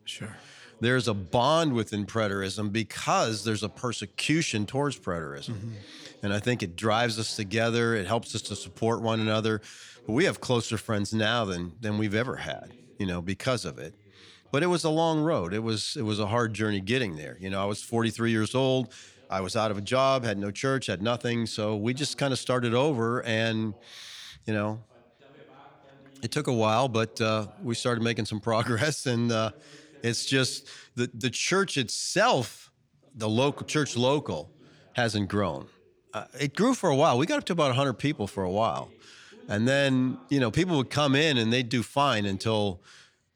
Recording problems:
voice in the background; faint; throughout; 30 dB below the speech

